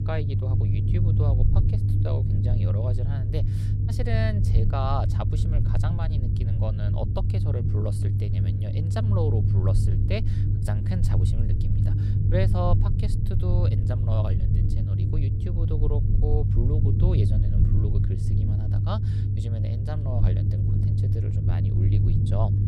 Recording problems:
low rumble; loud; throughout; 1 dB below the speech

